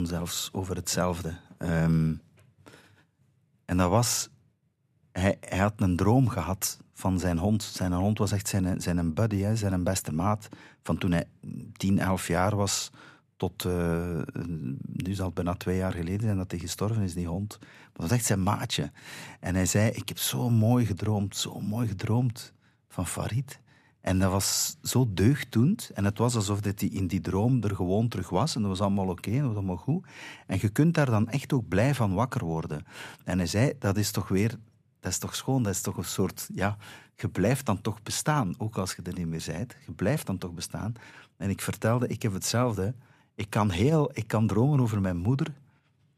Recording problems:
abrupt cut into speech; at the start

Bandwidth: 14.5 kHz